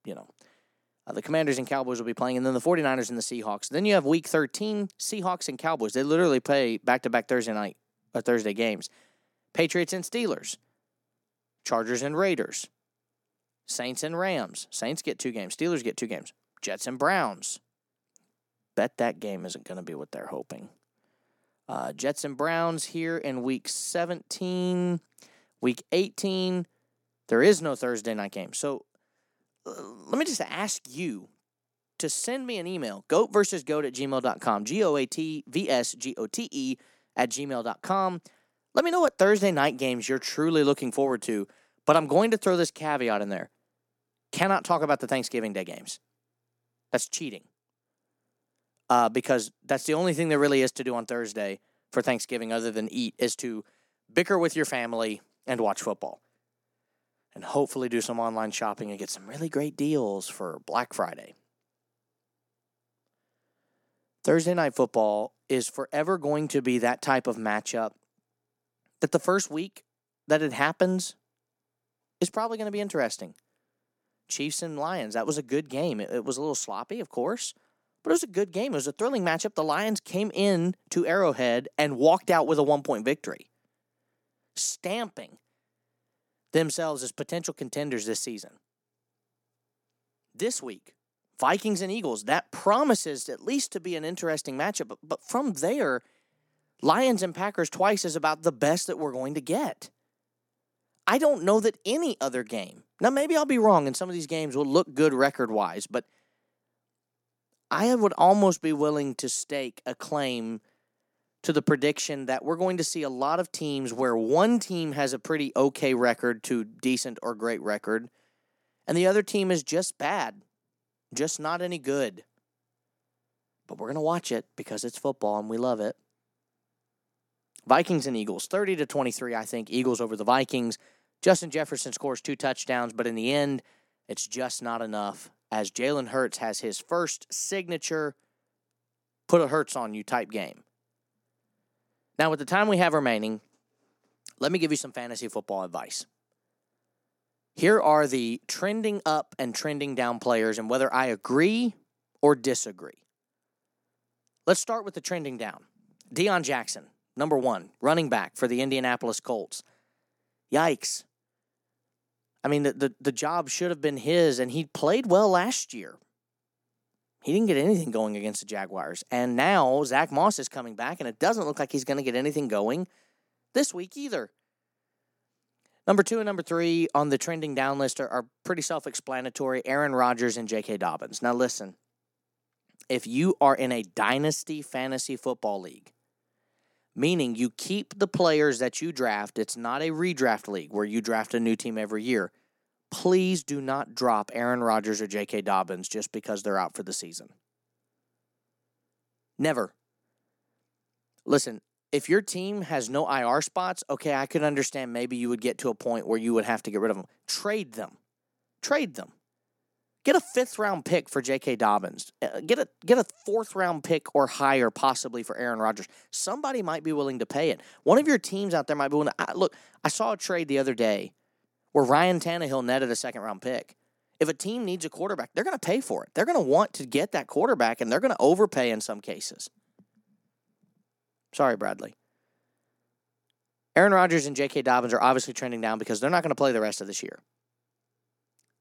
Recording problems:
none

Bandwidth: 17.5 kHz